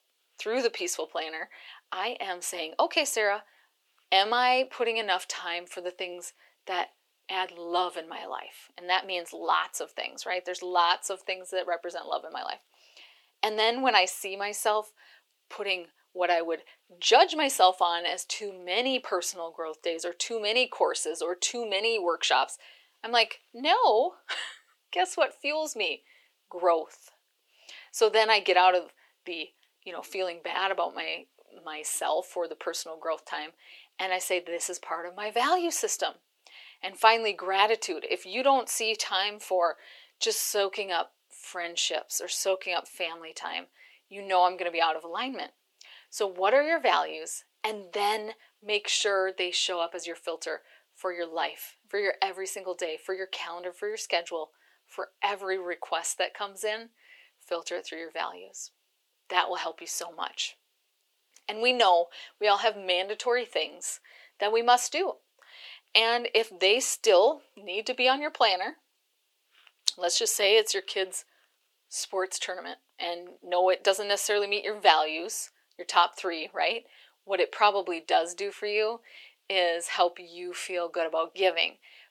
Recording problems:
thin; very; fading below 400 Hz

